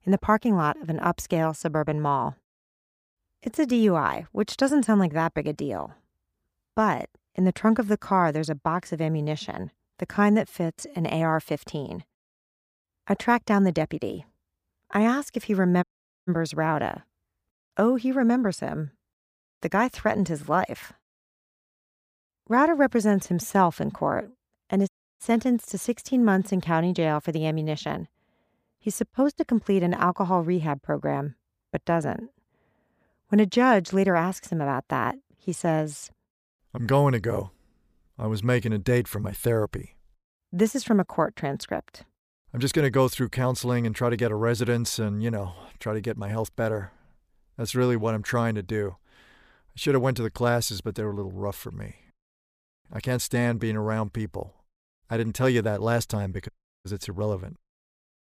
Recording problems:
audio cutting out; at 16 s, at 25 s and at 56 s

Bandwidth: 15 kHz